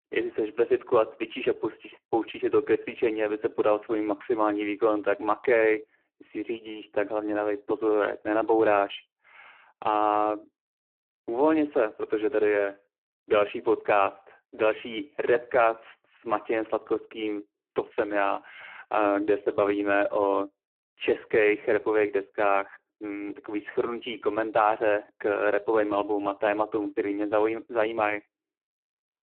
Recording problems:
phone-call audio; poor line

